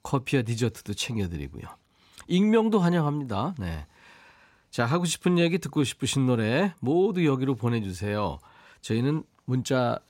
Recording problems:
none

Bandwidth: 16 kHz